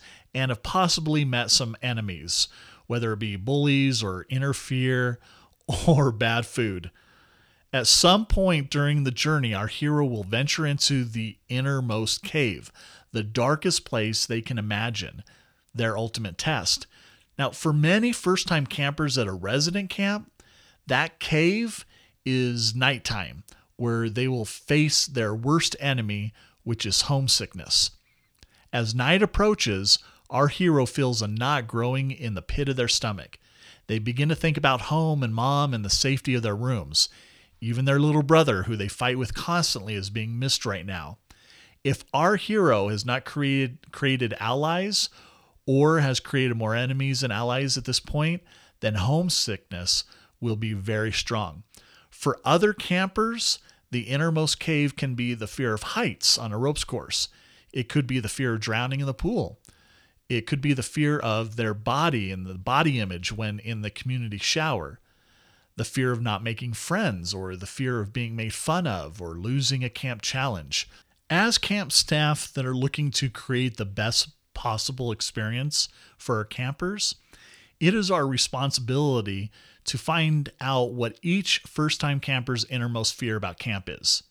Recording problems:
none

